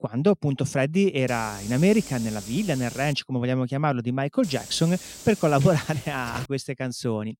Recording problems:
hiss; noticeable; from 1.5 to 3 s and from 4.5 to 6.5 s; 15 dB below the speech

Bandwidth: 16 kHz